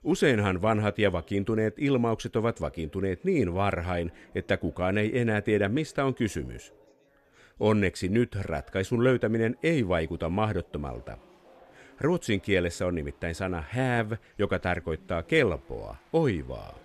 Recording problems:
chatter from many people; faint; throughout; 30 dB below the speech

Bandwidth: 13.5 kHz